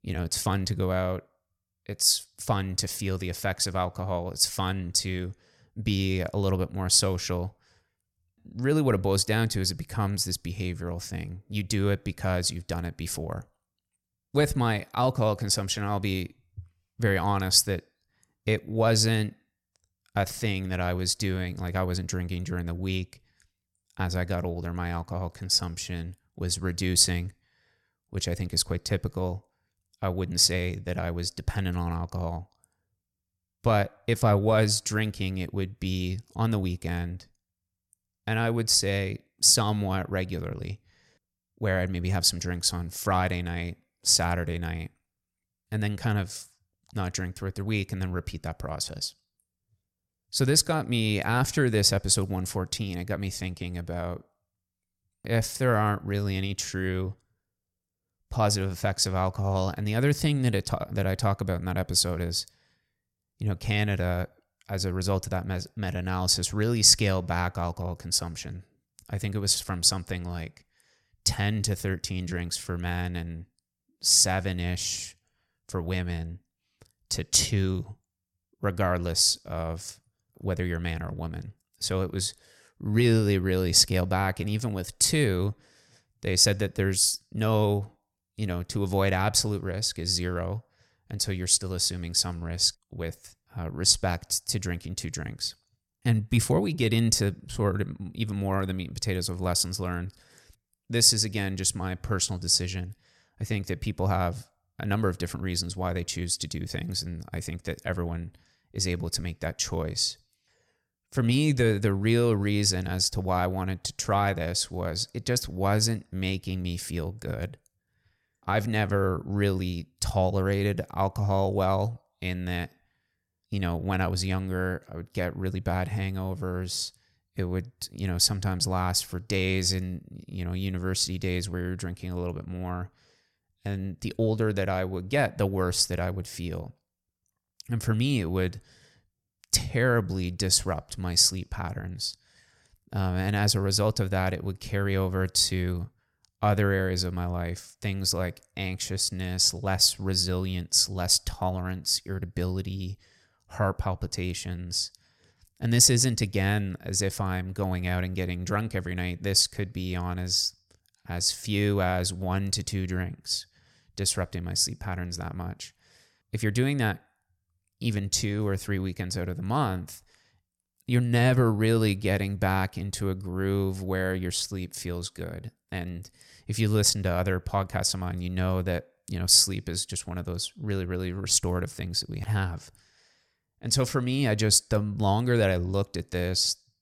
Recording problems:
none

